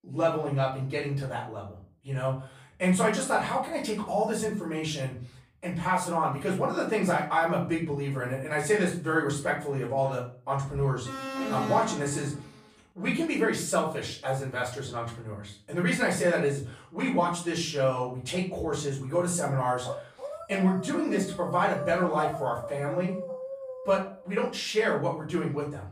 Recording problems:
off-mic speech; far
room echo; slight; dies away in 0.4 s
alarm; noticeable; from 11 to 12 s; peak 3 dB below the speech
dog barking; noticeable; from 20 to 24 s; peak 7 dB below the speech

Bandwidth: 15 kHz